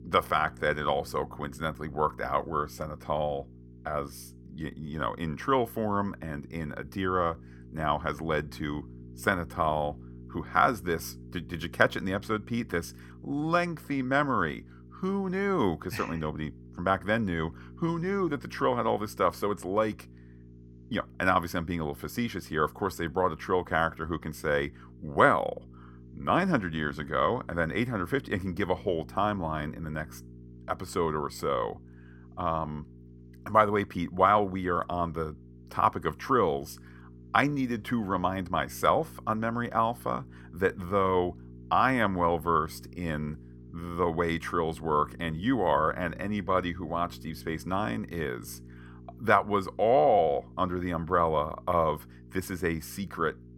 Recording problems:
electrical hum; faint; throughout; 60 Hz, 30 dB below the speech

